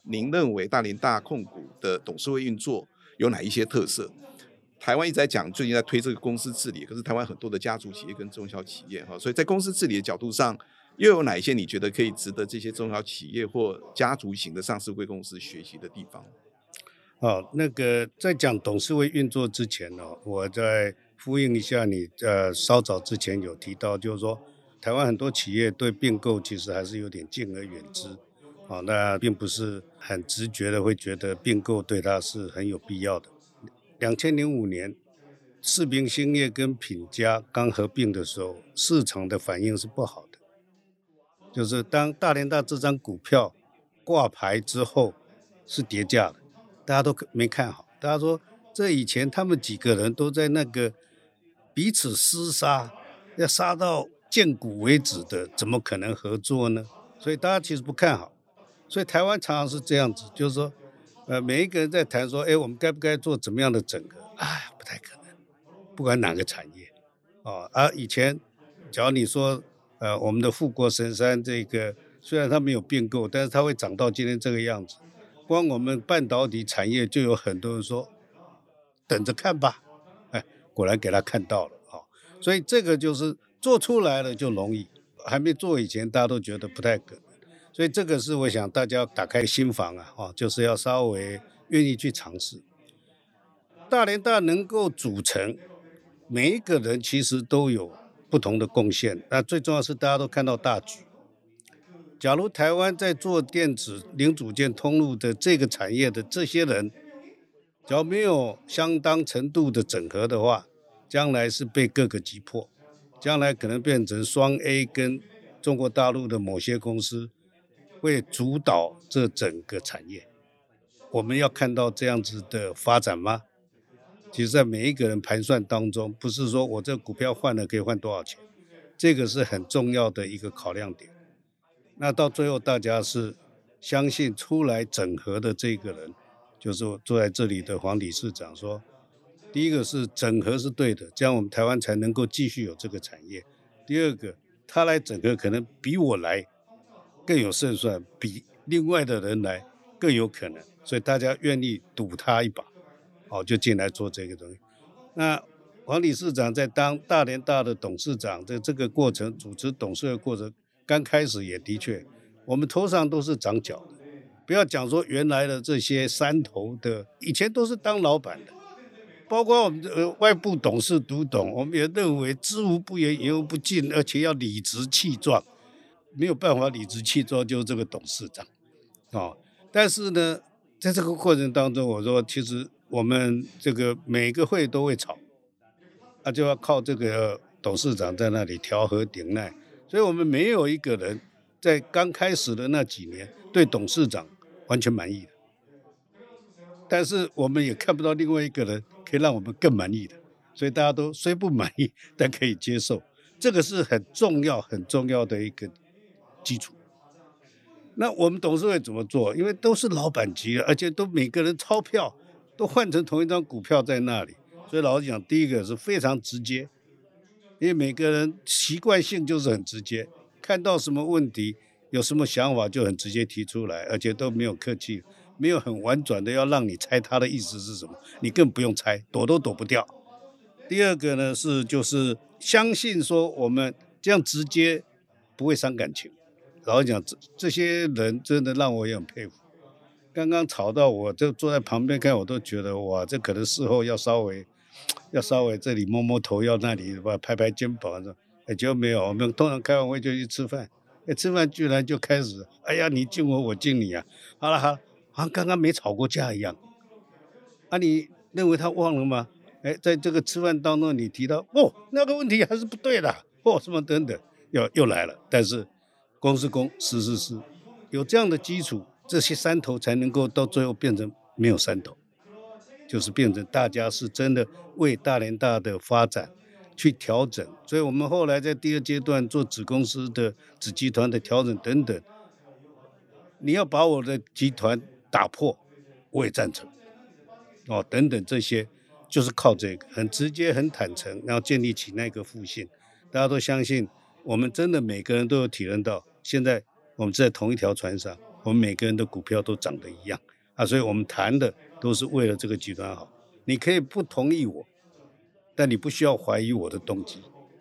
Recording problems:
background chatter; faint; throughout; 4 voices, 30 dB below the speech

